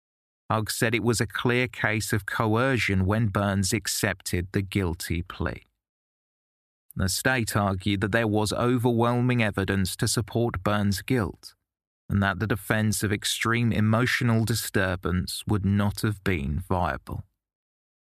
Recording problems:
none

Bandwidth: 14.5 kHz